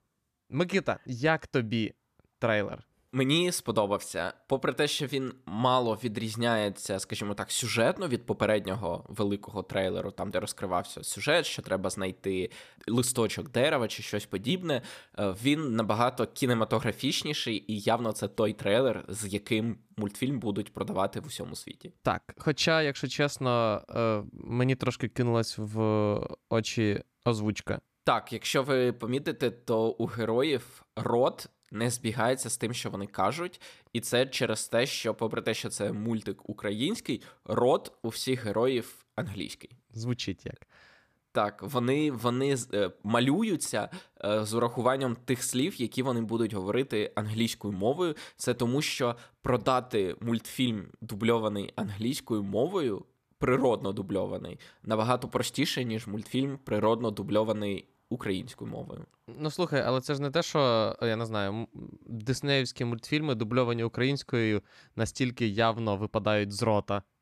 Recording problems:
none

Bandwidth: 14.5 kHz